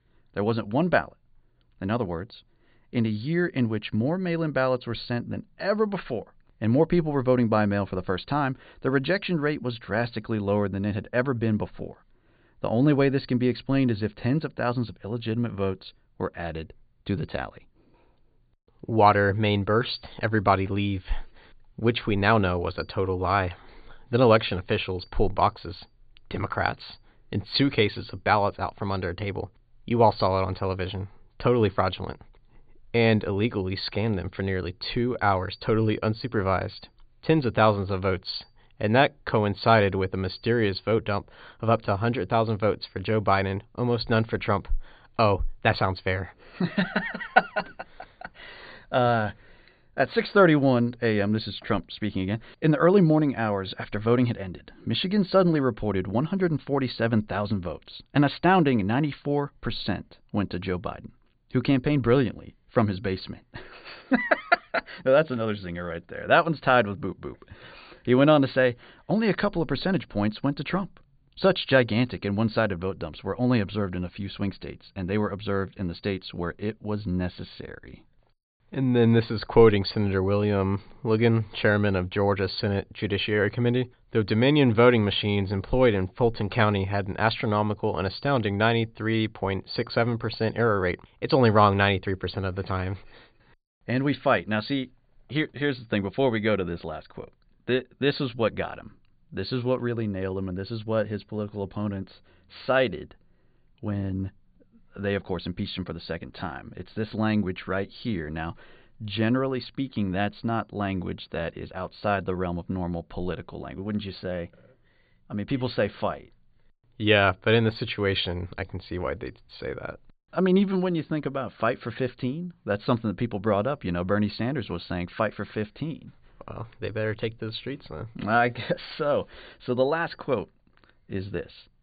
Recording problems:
high frequencies cut off; severe; nothing above 4.5 kHz

